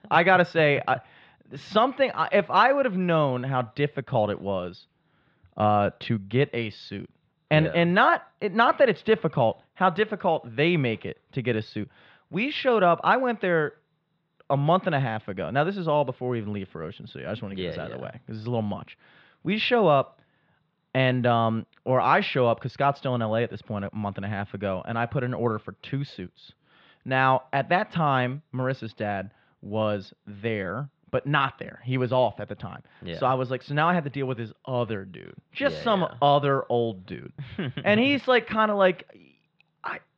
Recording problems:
muffled; very; fading above 3.5 kHz

